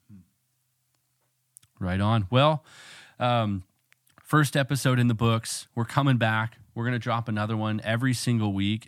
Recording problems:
none

